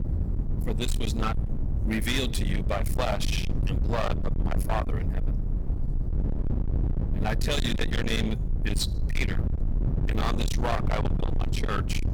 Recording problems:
distortion; heavy; 52% of the sound clipped
low rumble; loud; throughout; 7 dB below the speech

